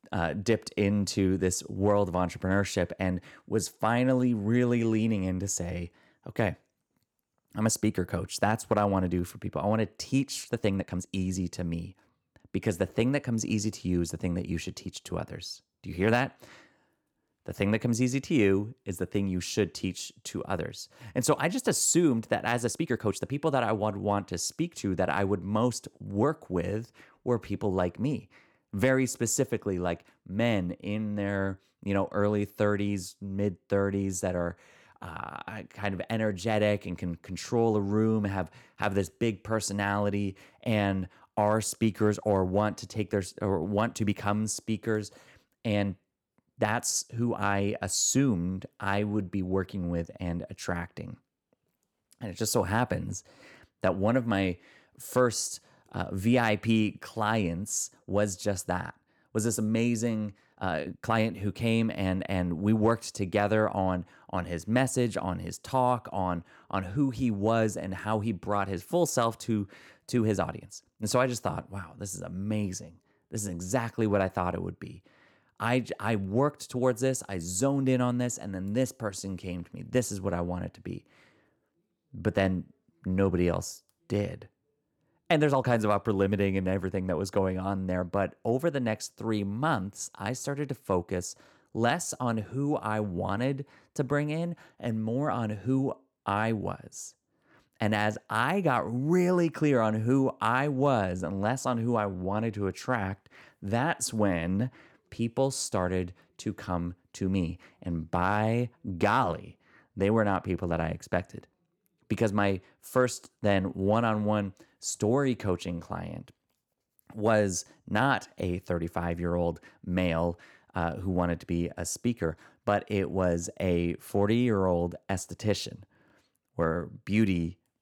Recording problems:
uneven, jittery; strongly; from 7.5 s to 1:58

